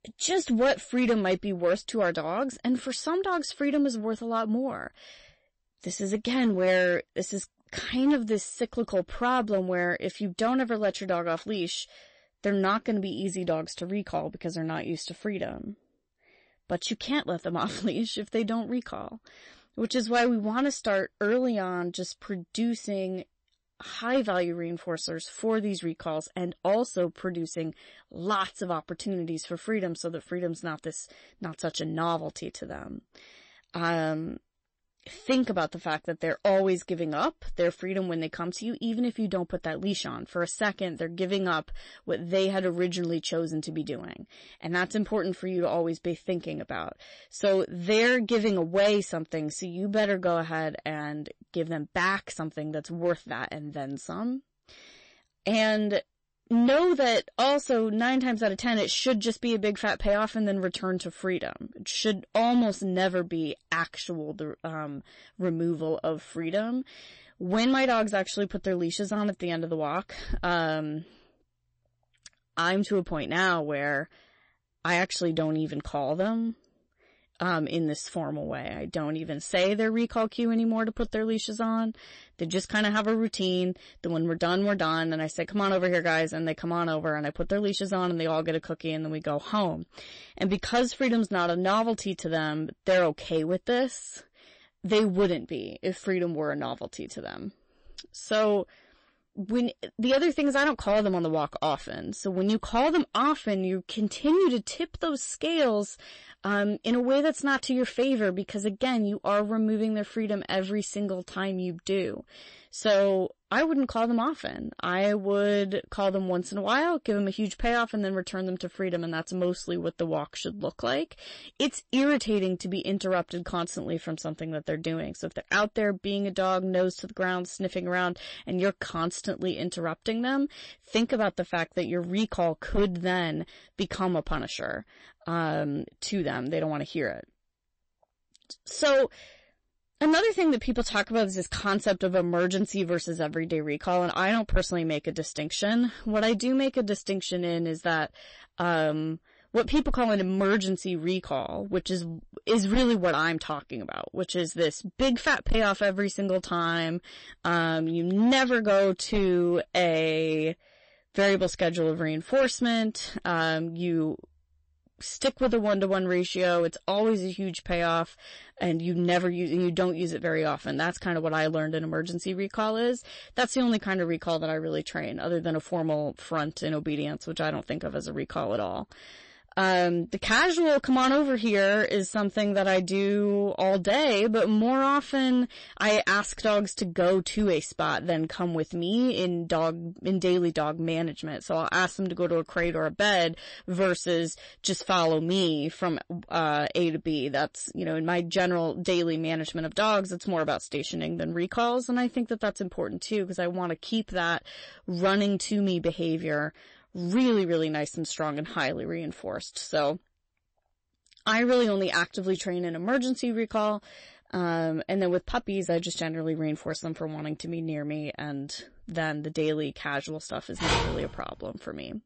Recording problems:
distortion; slight; 3% of the sound clipped
garbled, watery; slightly; nothing above 8 kHz
phone ringing; loud; at 3:41; peak 2 dB above the speech

